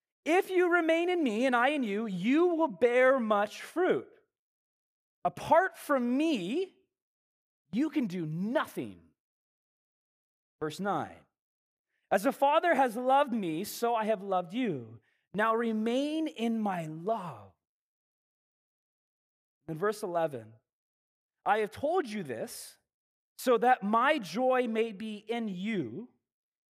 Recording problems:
none

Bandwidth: 15 kHz